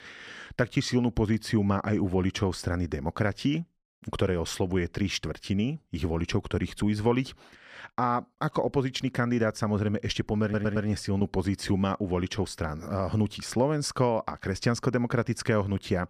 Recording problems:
audio stuttering; at 10 s

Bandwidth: 15 kHz